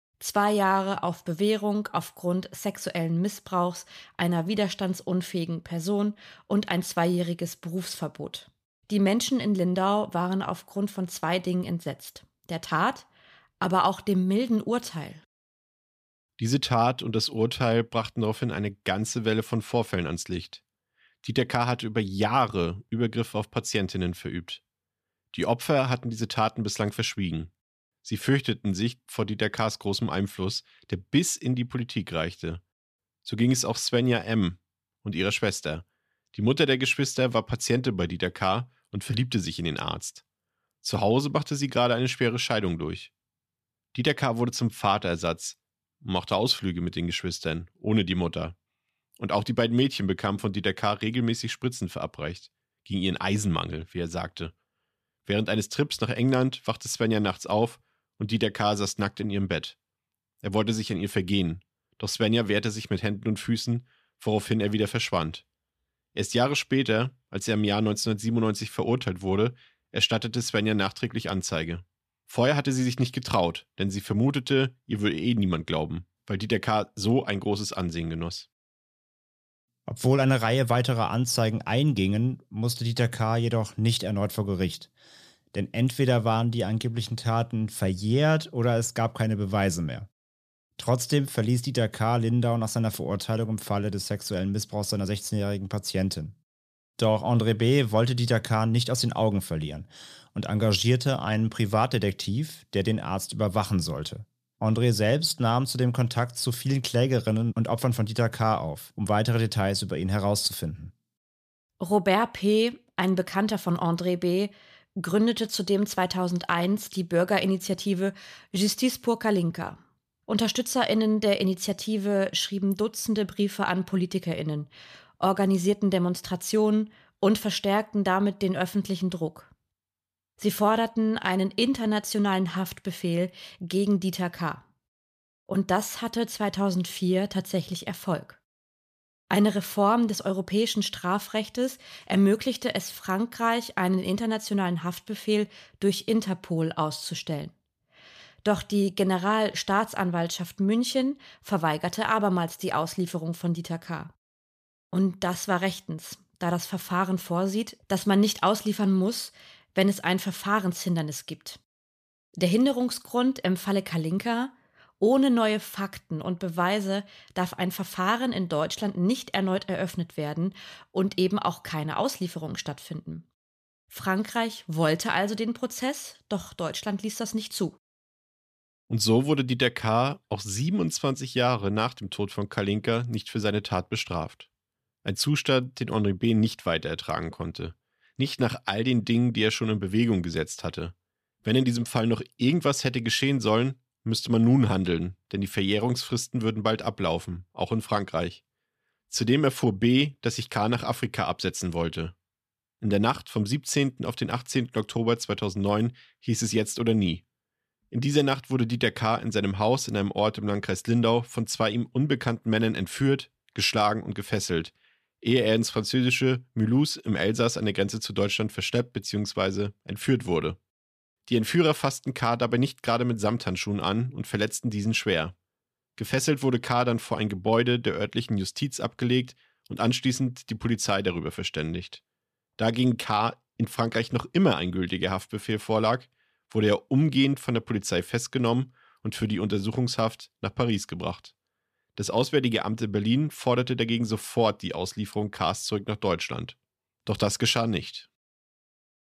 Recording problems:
none

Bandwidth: 14.5 kHz